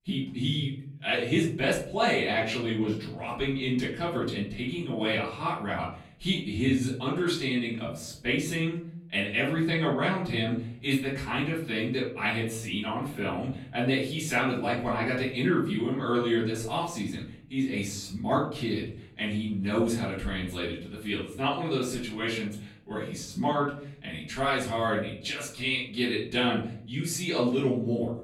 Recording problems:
off-mic speech; far
room echo; noticeable; dies away in 0.6 s

